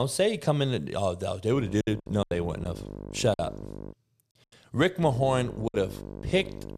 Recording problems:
electrical hum; noticeable; from 1.5 to 4 s and from 5 s on; 50 Hz, 15 dB below the speech
abrupt cut into speech; at the start
choppy; very; from 2 to 3.5 s and at 5.5 s; 9% of the speech affected

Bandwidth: 14.5 kHz